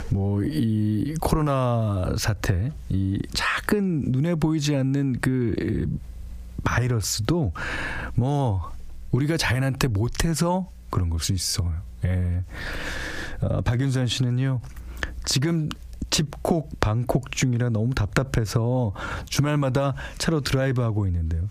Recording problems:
squashed, flat; heavily

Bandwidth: 15 kHz